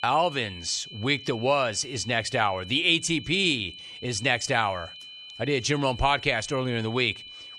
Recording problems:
high-pitched whine; noticeable; throughout; 3 kHz, 15 dB below the speech

